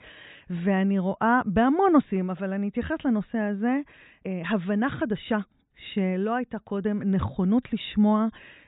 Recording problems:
high frequencies cut off; severe; nothing above 4 kHz

